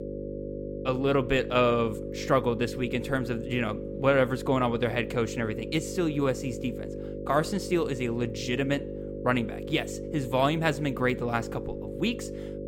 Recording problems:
electrical hum; noticeable; throughout; 50 Hz, 10 dB below the speech

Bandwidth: 16 kHz